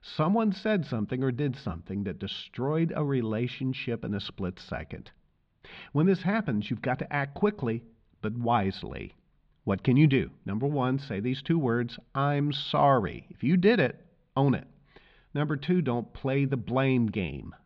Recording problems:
muffled; slightly; fading above 4 kHz

